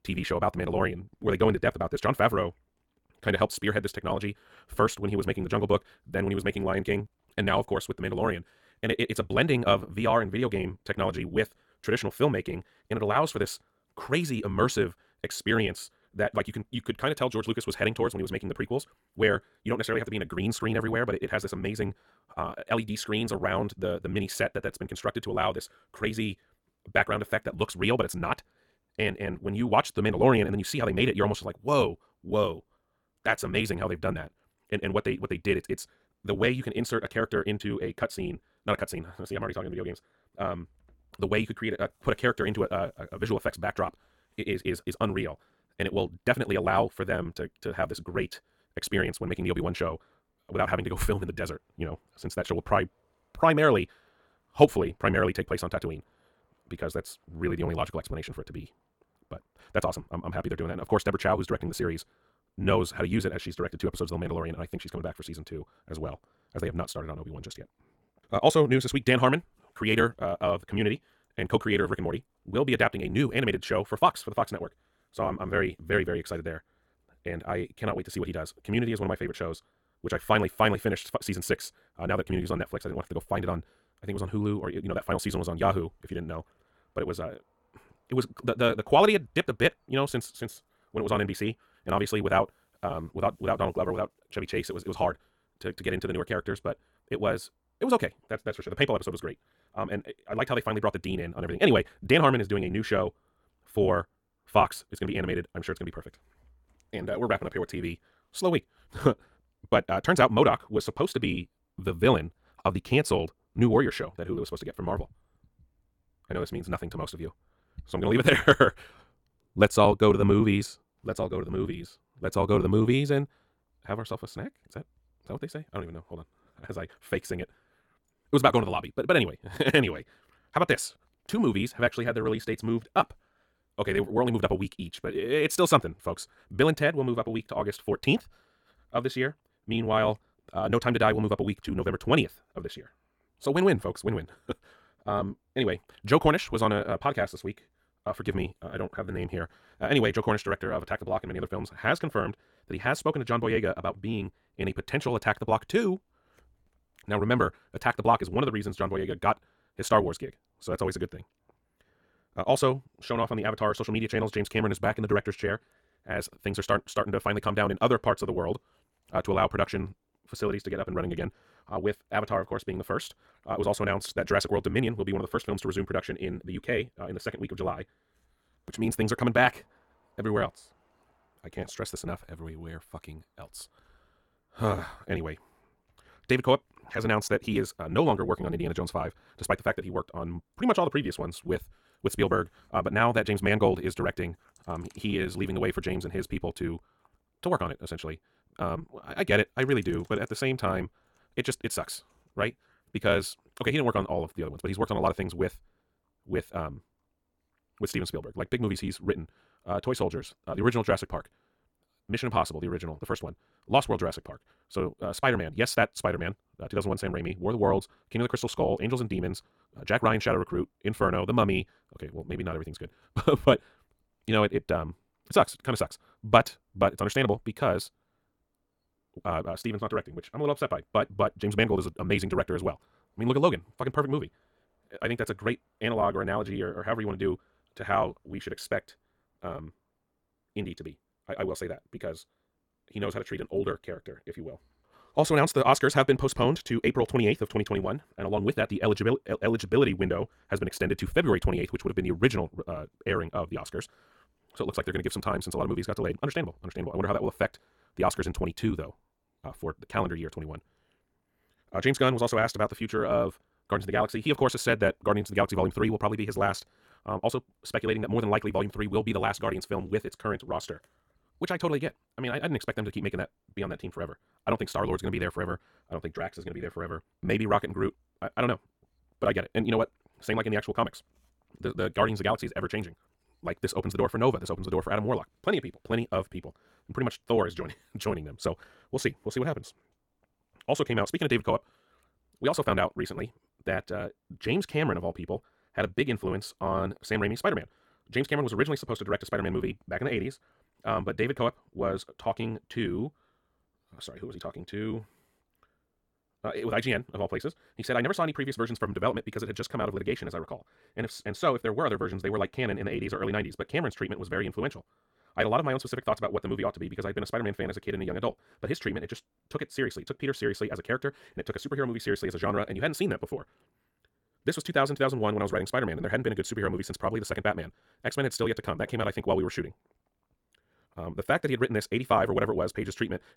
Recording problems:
wrong speed, natural pitch; too fast; 1.8 times normal speed

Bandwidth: 17.5 kHz